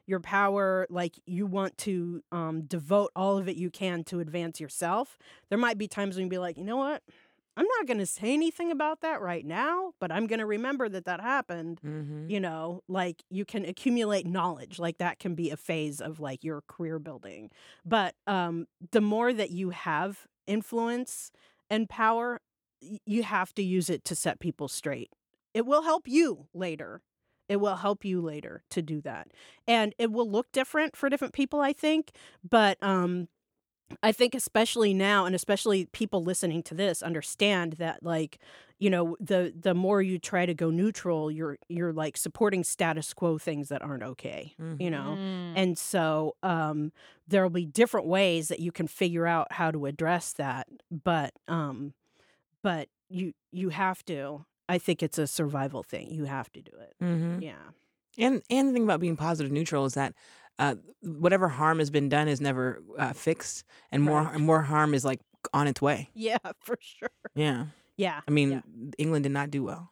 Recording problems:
none

